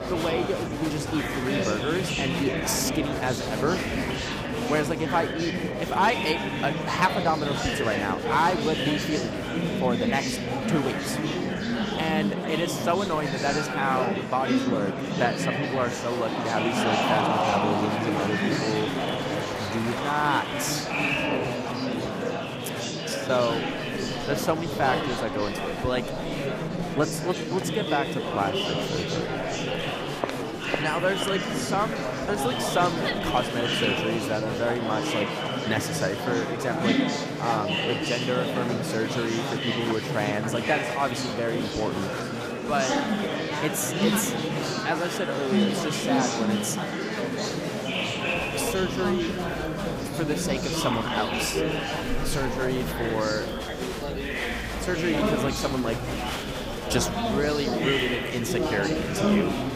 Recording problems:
echo of what is said; noticeable; from 24 s on; 230 ms later, 15 dB below the speech
murmuring crowd; very loud; throughout; 1 dB above the speech

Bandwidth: 15 kHz